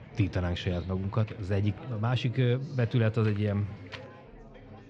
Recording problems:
muffled; slightly; fading above 3.5 kHz
chatter from many people; noticeable; throughout; 20 dB below the speech
wind noise on the microphone; occasional gusts; at 1 s and from 3 to 4 s; 15 dB below the speech
animal sounds; faint; until 1.5 s; 20 dB below the speech

